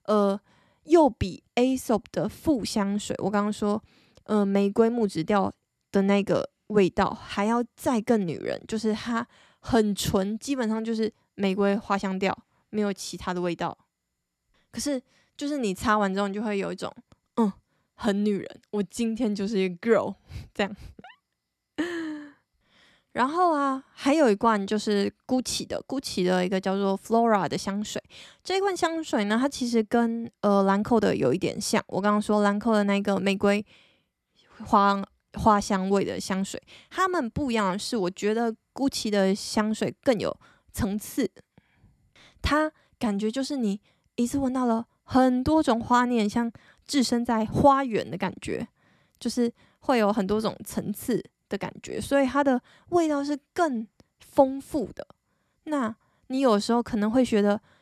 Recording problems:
none

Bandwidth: 13.5 kHz